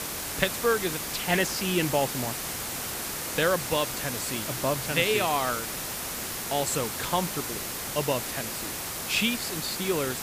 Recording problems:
hiss; loud; throughout; 3 dB below the speech

